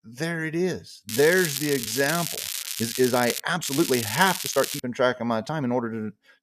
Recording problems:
crackling; loud; from 1 to 3.5 s and from 3.5 to 5 s; 5 dB below the speech
uneven, jittery; strongly; from 1 to 6 s

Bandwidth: 14.5 kHz